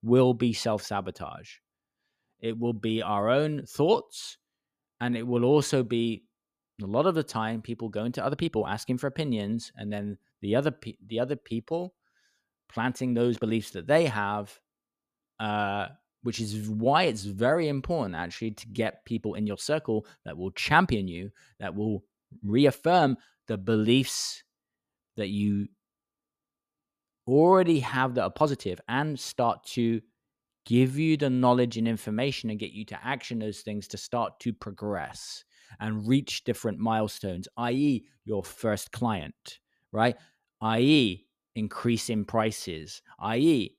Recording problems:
uneven, jittery; strongly; from 2 to 41 s

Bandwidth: 14.5 kHz